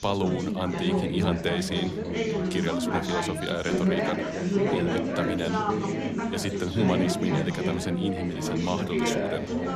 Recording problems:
chatter from many people; very loud; throughout; 3 dB above the speech
background music; faint; throughout; 25 dB below the speech

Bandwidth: 14 kHz